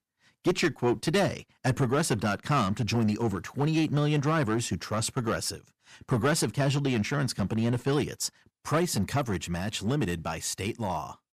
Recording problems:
distortion; slight; 5% of the sound clipped

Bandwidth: 14.5 kHz